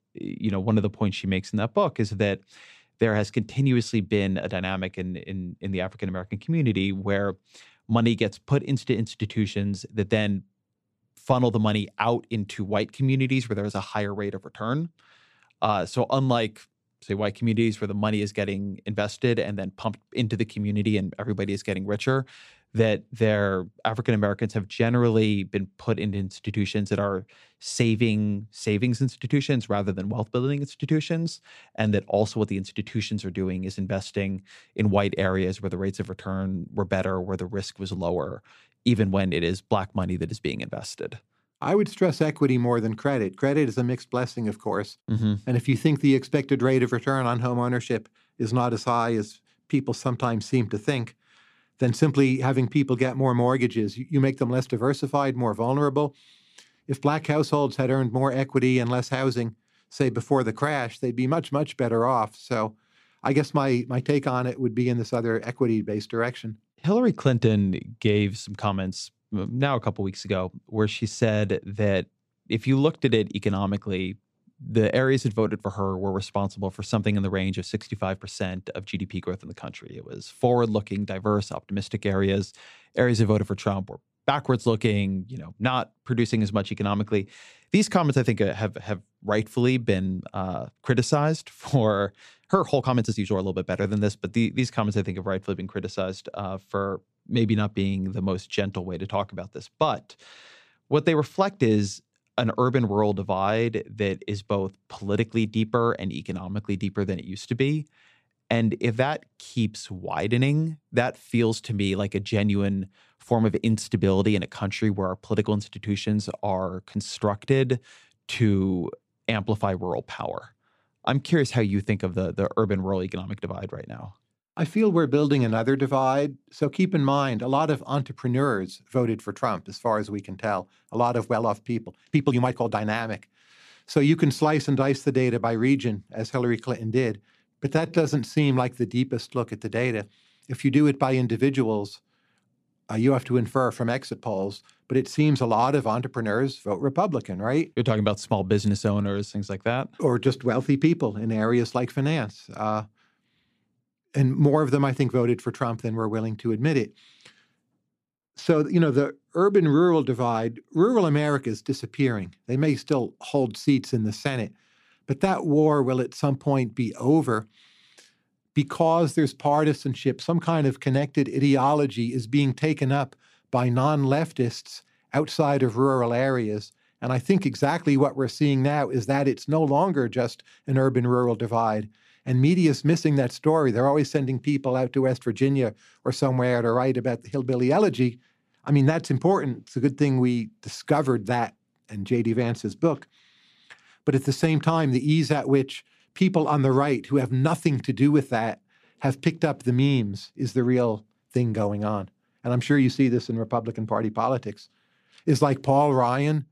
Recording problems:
uneven, jittery; strongly; from 1:33 to 2:18

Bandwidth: 14.5 kHz